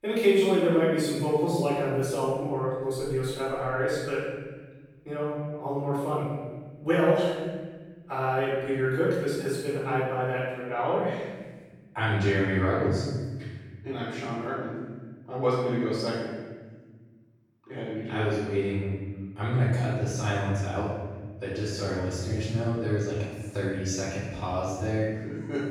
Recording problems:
room echo; strong; dies away in 1.4 s
off-mic speech; far

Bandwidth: 18.5 kHz